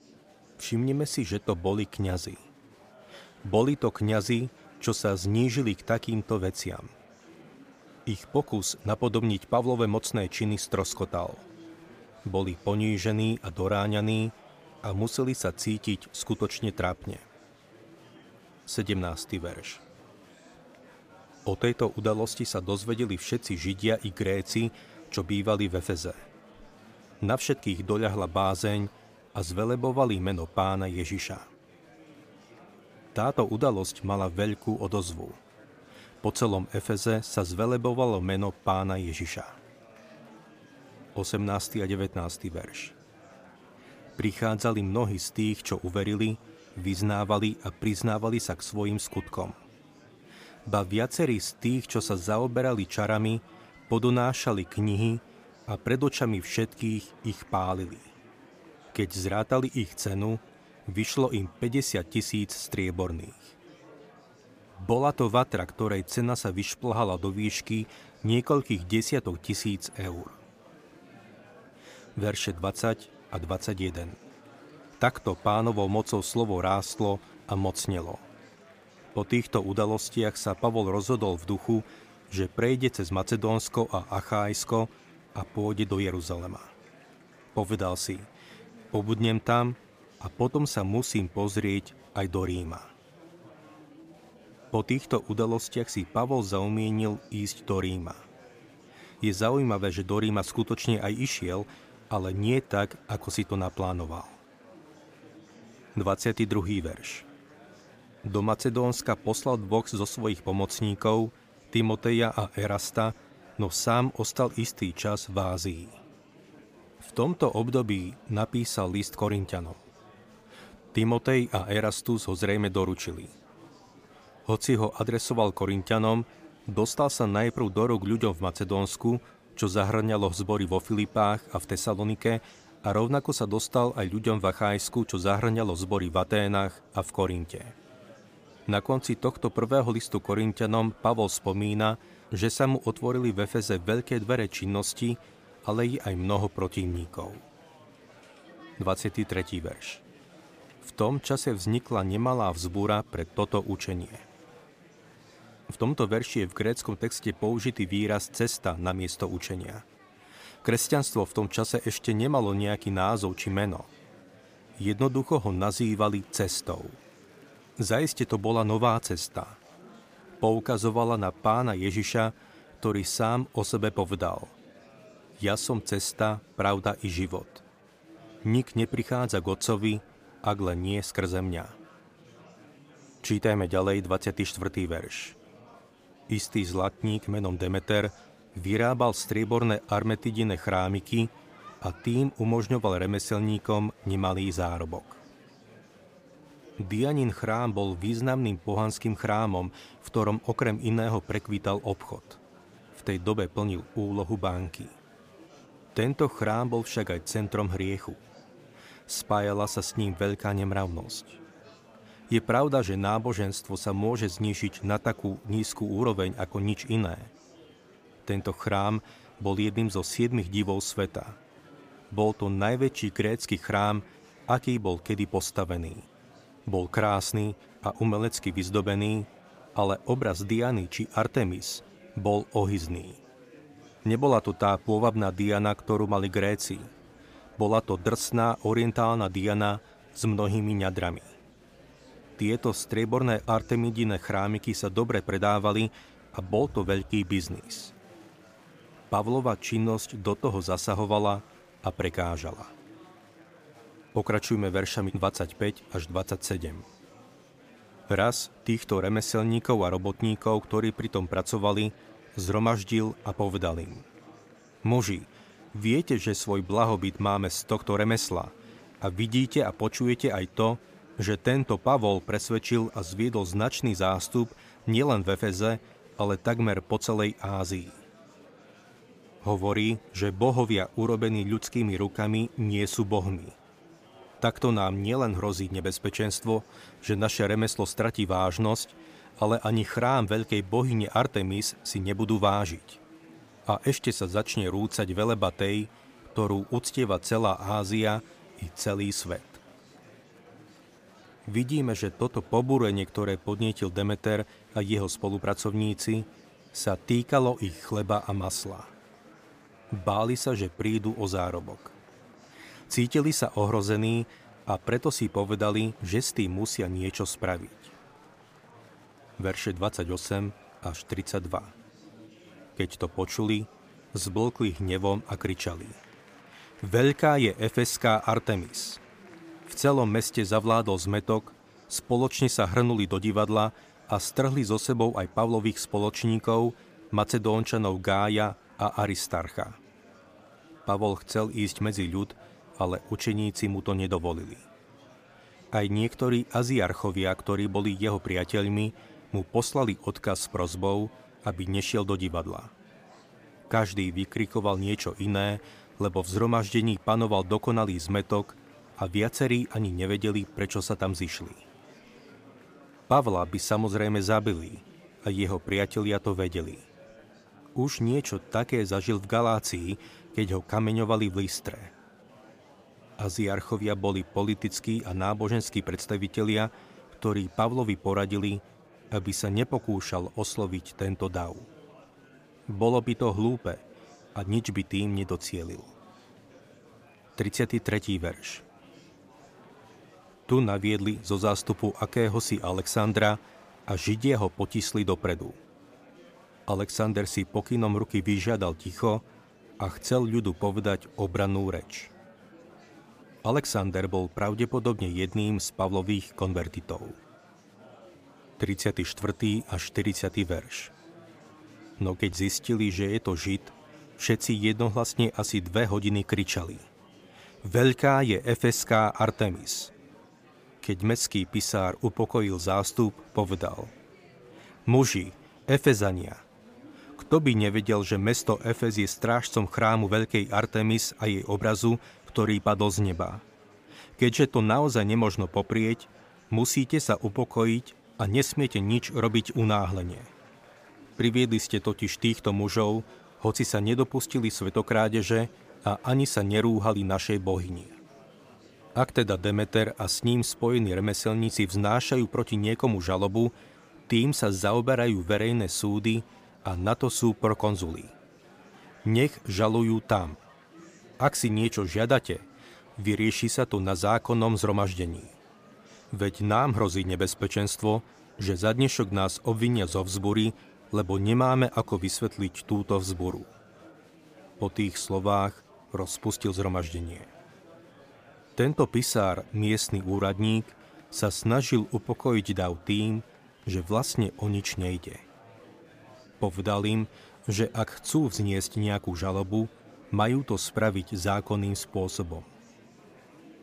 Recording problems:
murmuring crowd; faint; throughout; 25 dB below the speech

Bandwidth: 15 kHz